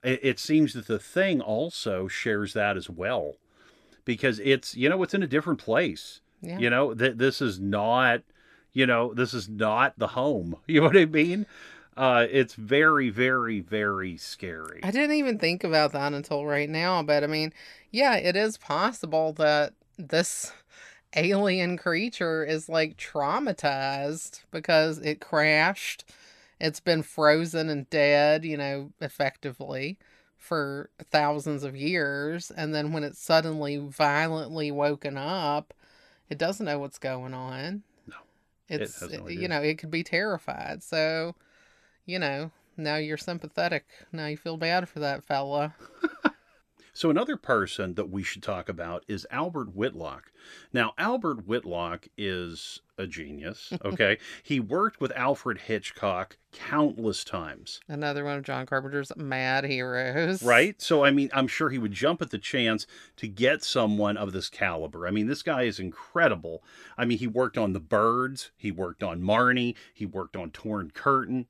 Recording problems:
none

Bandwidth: 14 kHz